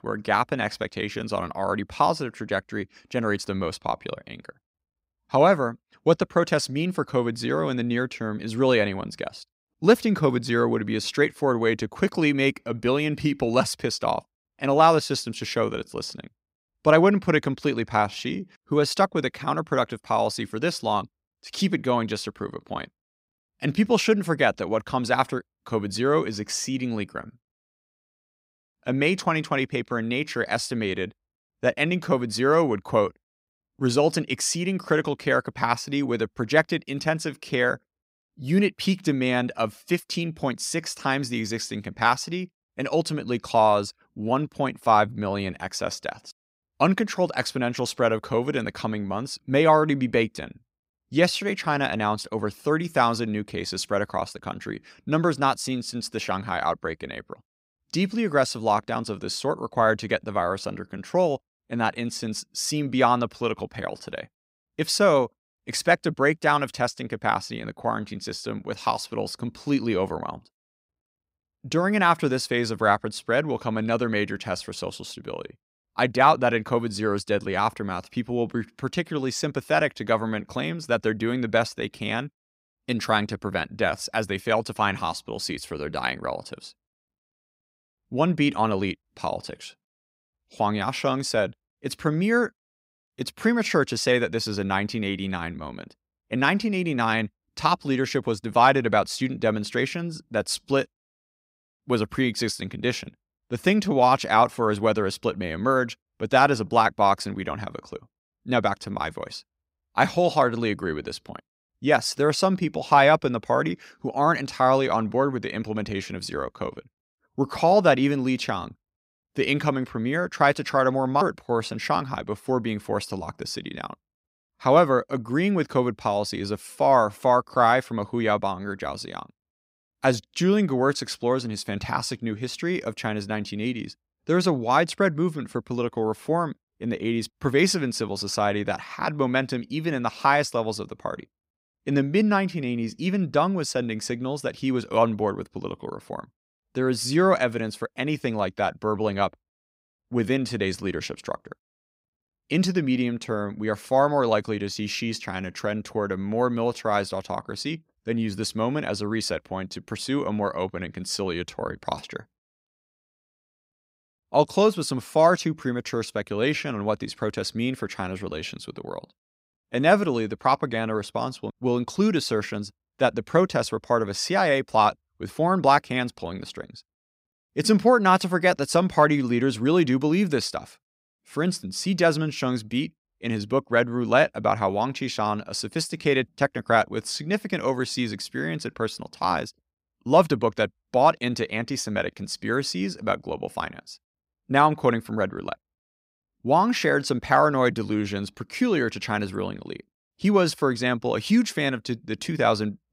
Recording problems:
none

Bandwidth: 15.5 kHz